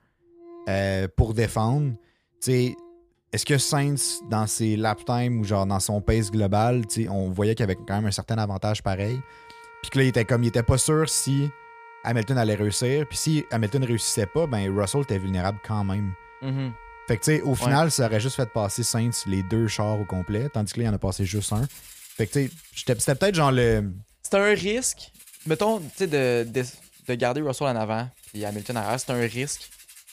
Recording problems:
background music; faint; throughout; 20 dB below the speech

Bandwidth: 15 kHz